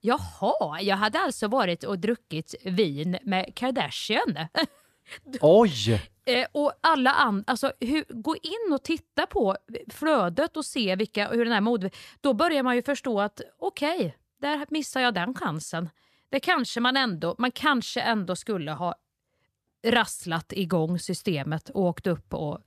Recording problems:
none

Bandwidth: 14.5 kHz